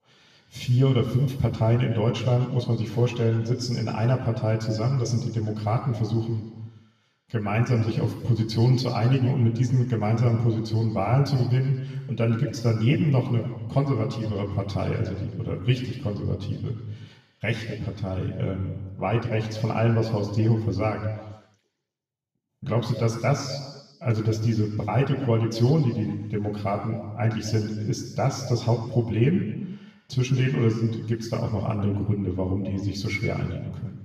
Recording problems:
off-mic speech; far
room echo; noticeable; dies away in 1.2 s

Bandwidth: 14.5 kHz